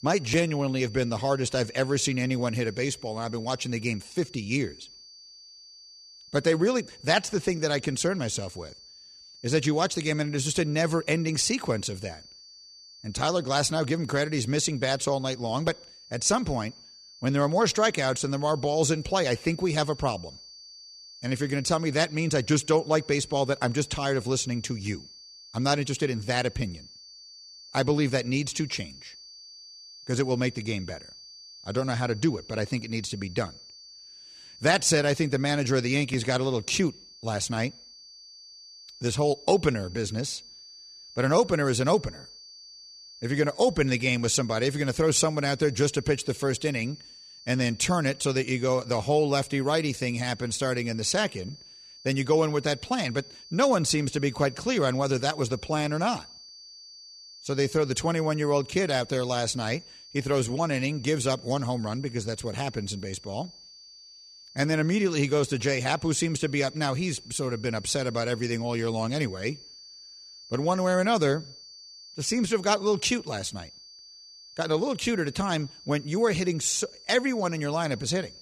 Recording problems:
high-pitched whine; noticeable; throughout; 4.5 kHz, 20 dB below the speech

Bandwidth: 14 kHz